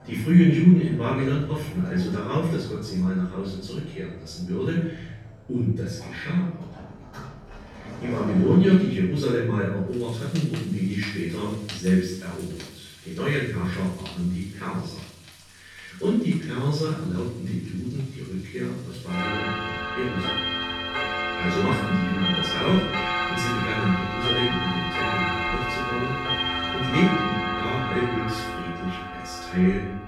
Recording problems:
room echo; strong; dies away in 0.6 s
off-mic speech; far
household noises; loud; throughout; 2 dB below the speech

